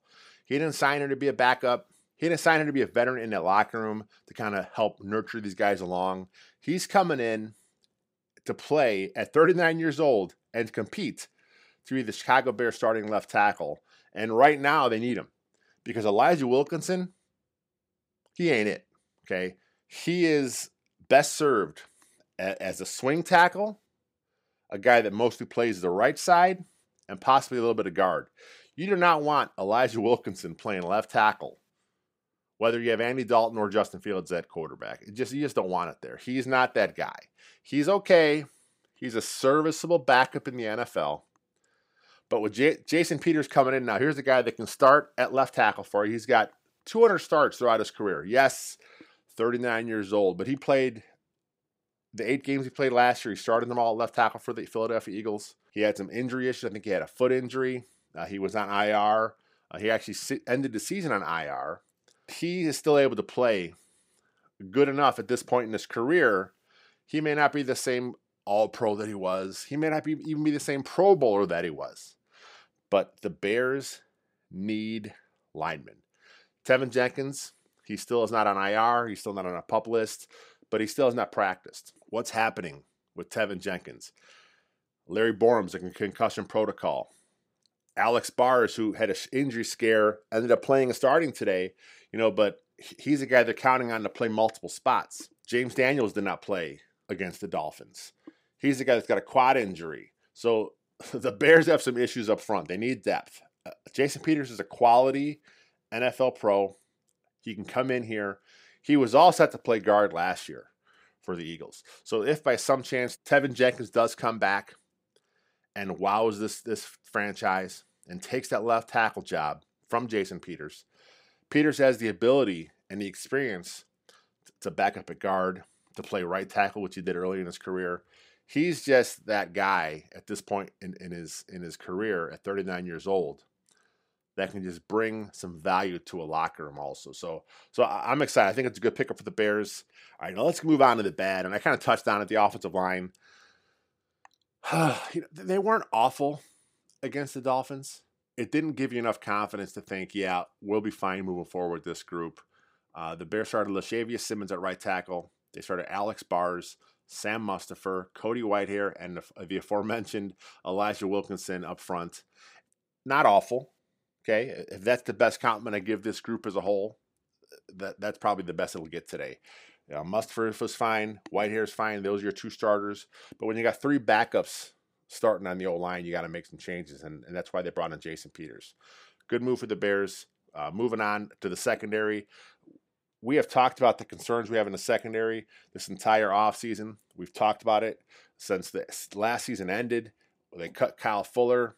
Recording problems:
none

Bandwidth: 15.5 kHz